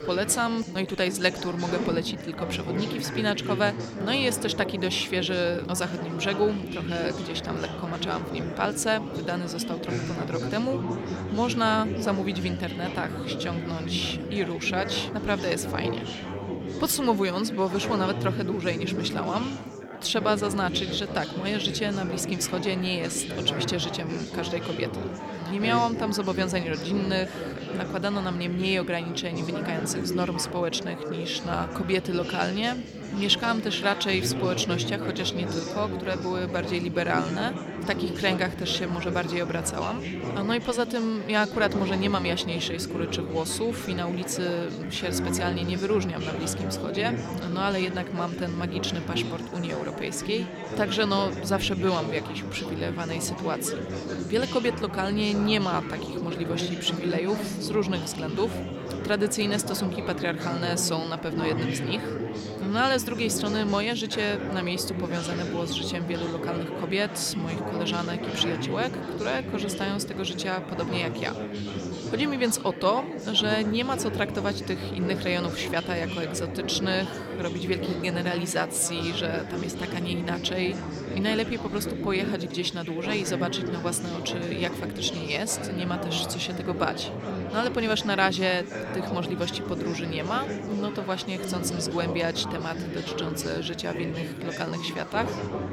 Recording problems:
chatter from many people; loud; throughout; 5 dB below the speech

